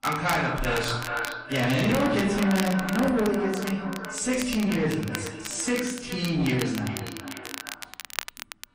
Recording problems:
echo of what is said; strong; throughout; 410 ms later, 10 dB below the speech
off-mic speech; far
room echo; noticeable; dies away in 0.7 s
distortion; slight; 10 dB below the speech
garbled, watery; slightly
crackle, like an old record; noticeable; 10 dB below the speech

